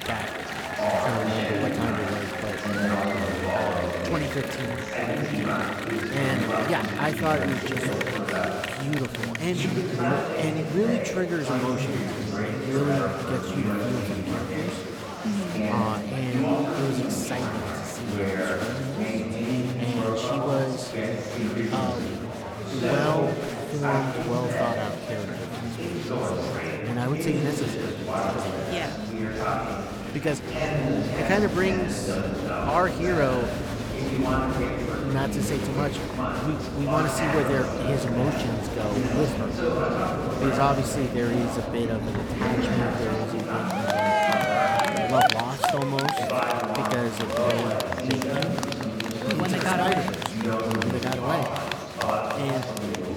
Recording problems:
chatter from many people; very loud; throughout; 2 dB above the speech

